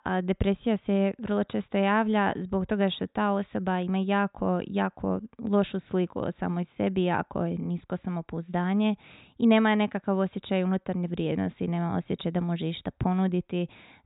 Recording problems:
high frequencies cut off; severe; nothing above 4 kHz

